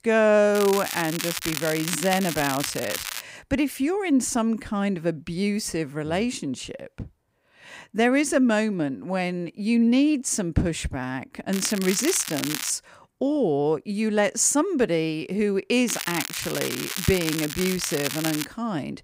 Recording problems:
crackling; loud; from 0.5 to 3 s, from 12 to 13 s and from 16 to 18 s; 6 dB below the speech

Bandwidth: 15.5 kHz